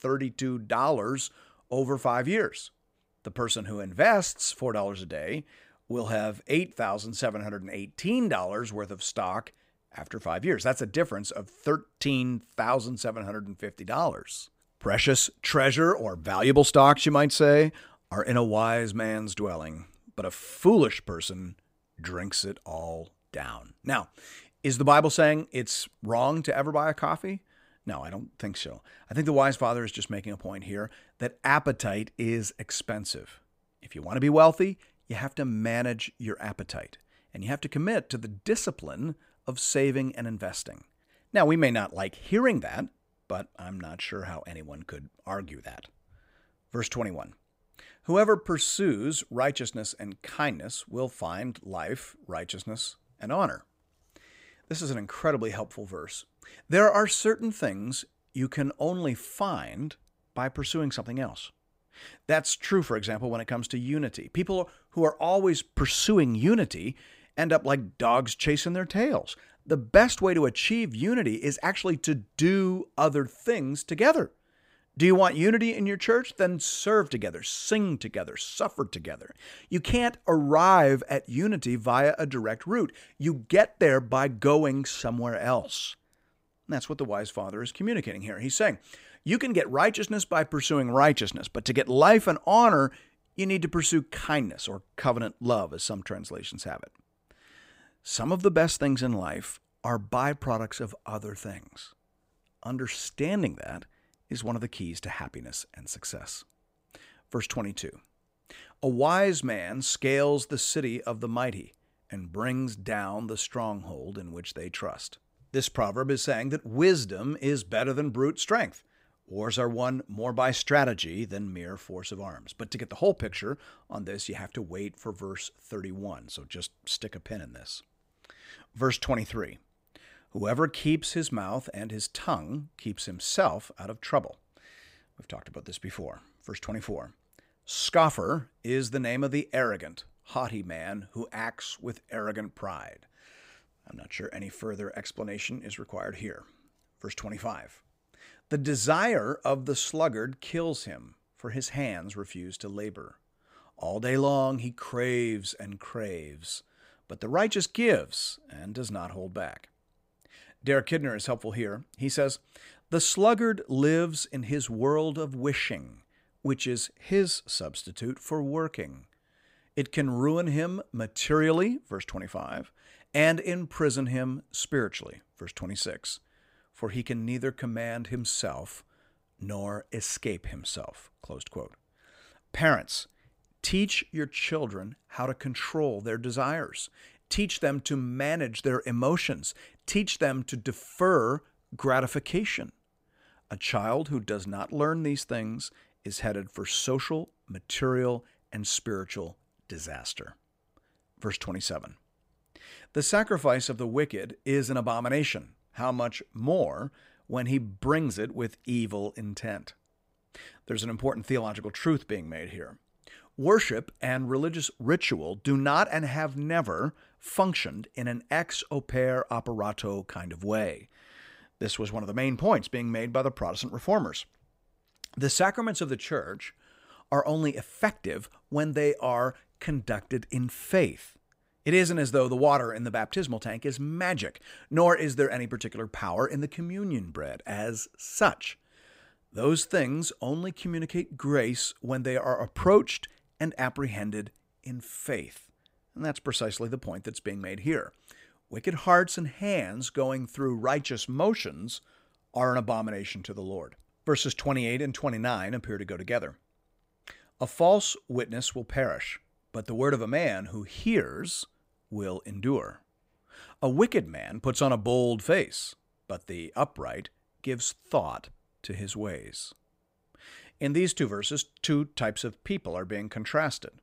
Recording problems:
none

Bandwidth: 15.5 kHz